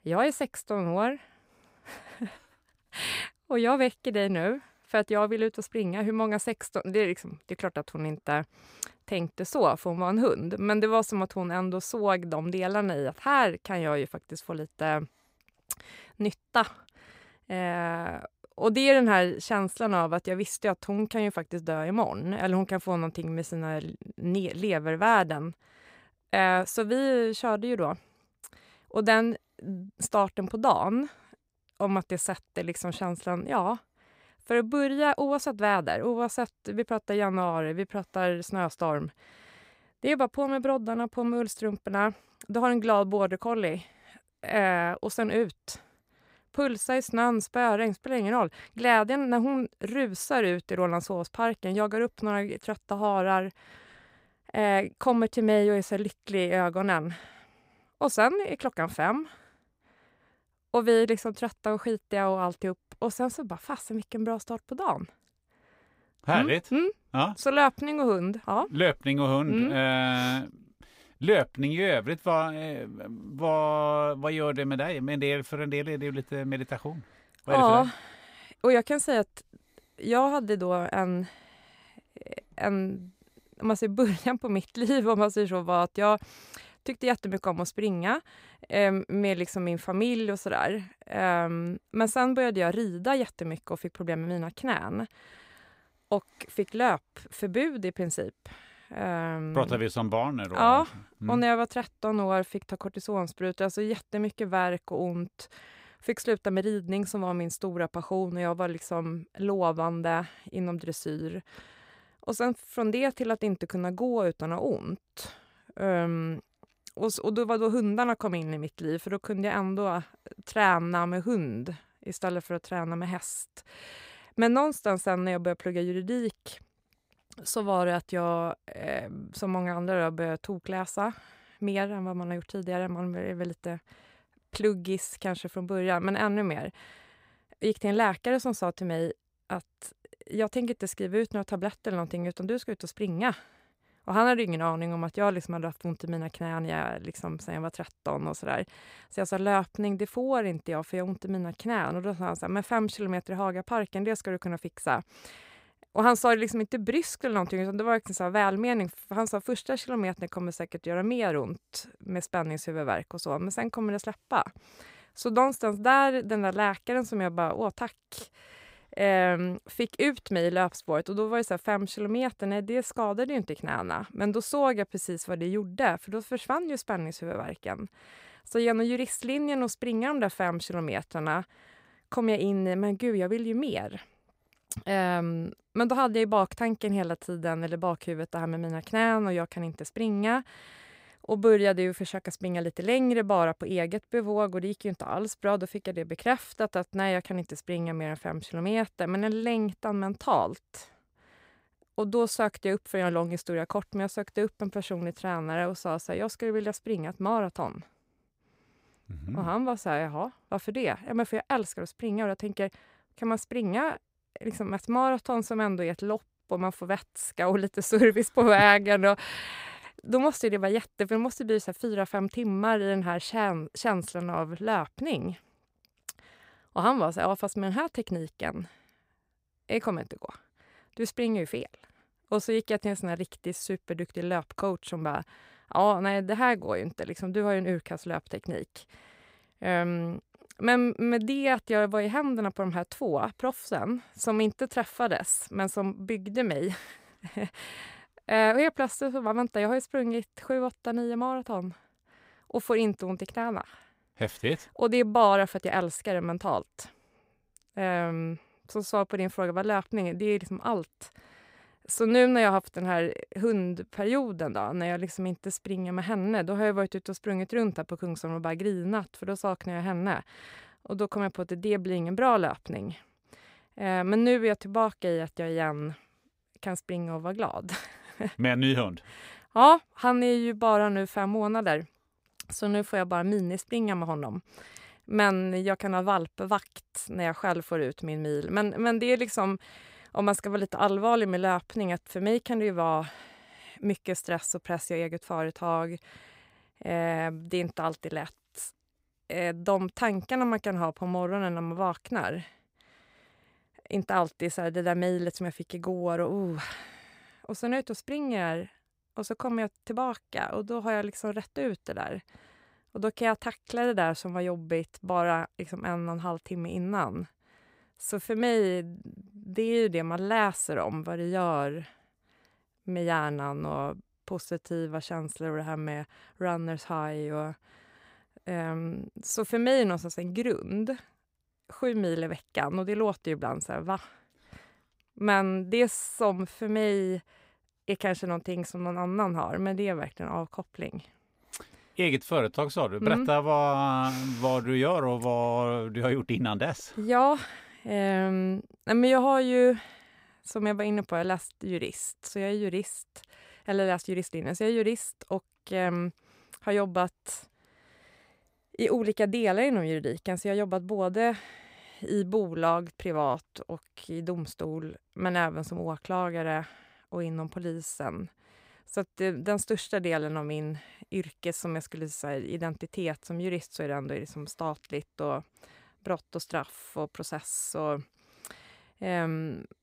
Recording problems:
none

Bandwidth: 15.5 kHz